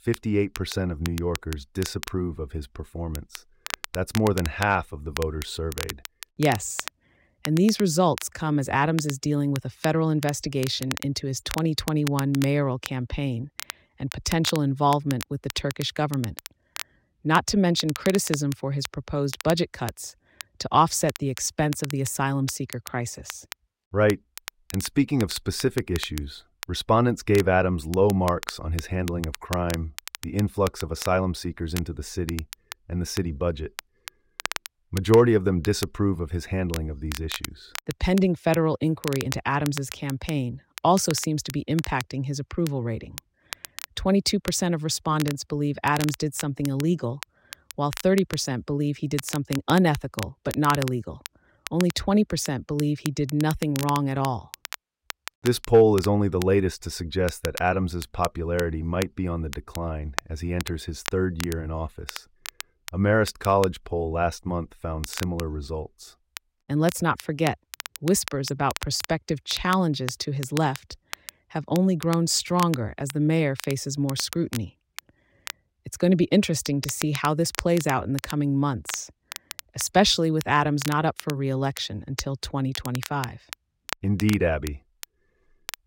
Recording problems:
crackle, like an old record; noticeable; 15 dB below the speech

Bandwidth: 16 kHz